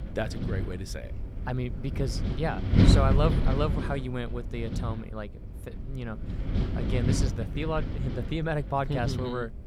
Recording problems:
wind noise on the microphone; heavy; 4 dB below the speech

